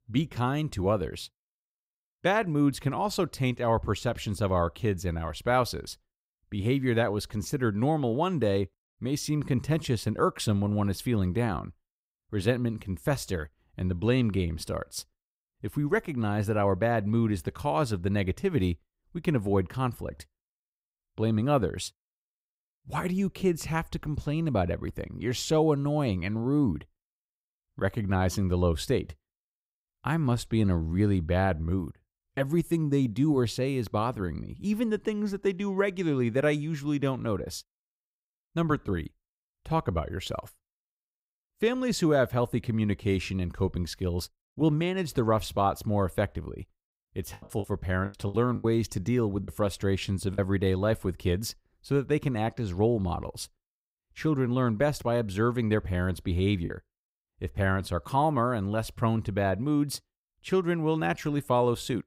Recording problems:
choppy; very; from 47 to 50 s and at 57 s; 13% of the speech affected

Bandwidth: 15.5 kHz